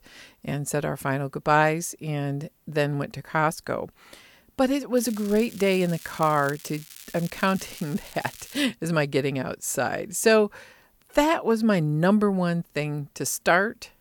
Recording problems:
crackling; noticeable; from 5 to 8.5 s; 20 dB below the speech

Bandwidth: 18 kHz